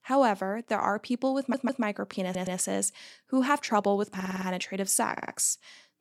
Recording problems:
audio stuttering; 4 times, first at 1.5 s

